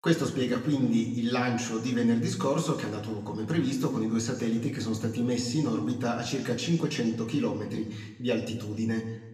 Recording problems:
room echo; slight; dies away in 1 s
off-mic speech; somewhat distant

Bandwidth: 14.5 kHz